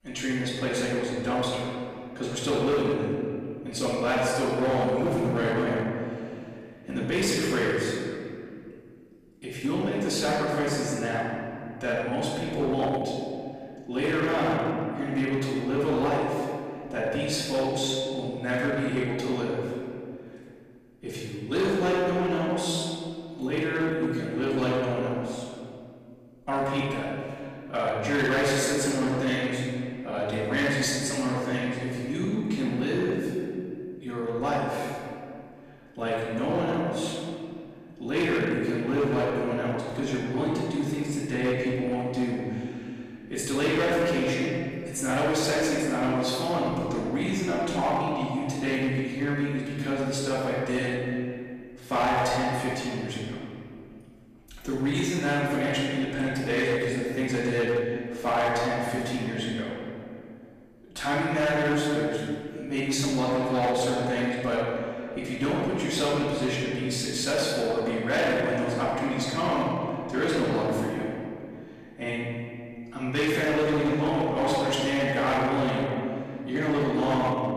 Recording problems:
room echo; strong; dies away in 2.3 s
off-mic speech; far
distortion; slight; 7% of the sound clipped

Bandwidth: 14.5 kHz